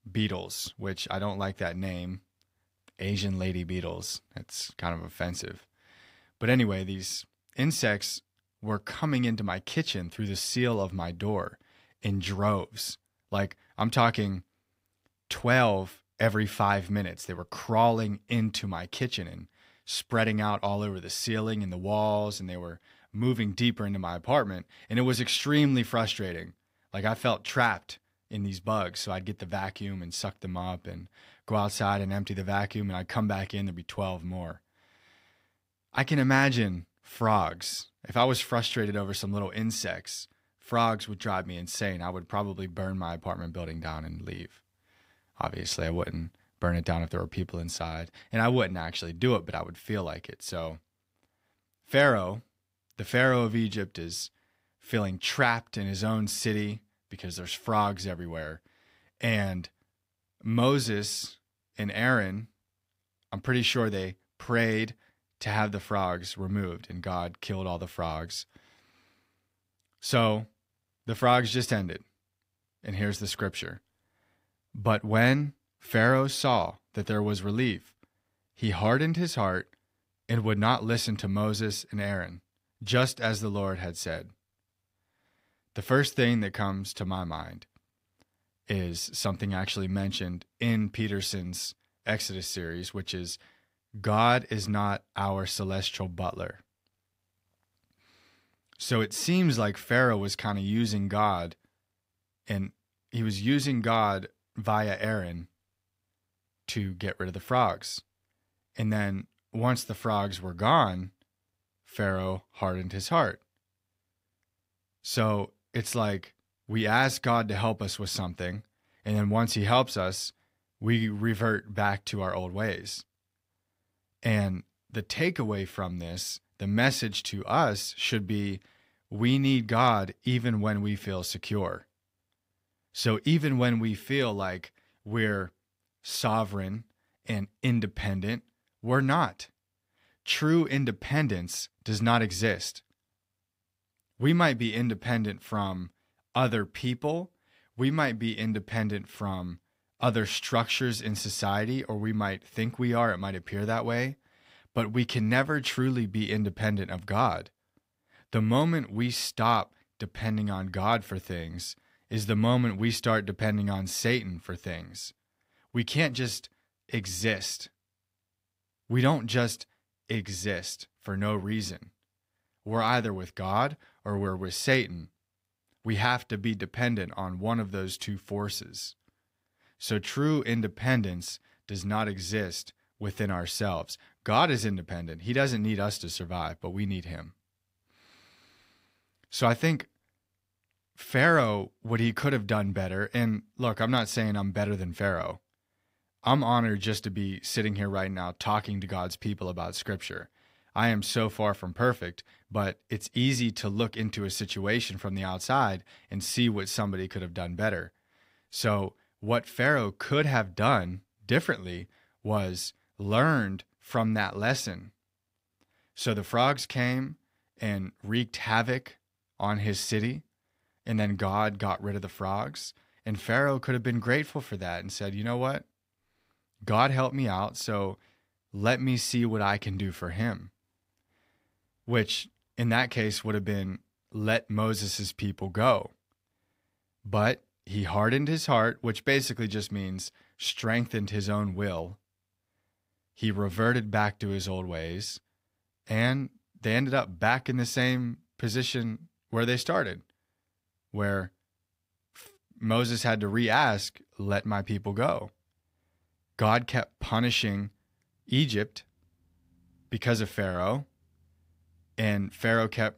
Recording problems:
none

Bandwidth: 15.5 kHz